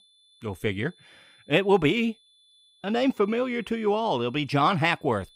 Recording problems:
high-pitched whine; faint; throughout; 3.5 kHz, 30 dB below the speech

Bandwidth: 15.5 kHz